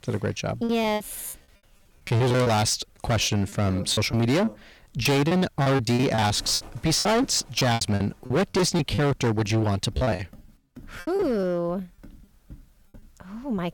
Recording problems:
distortion; heavy; 14% of the sound clipped
animal sounds; faint; throughout; 25 dB below the speech
choppy; very; 13% of the speech affected

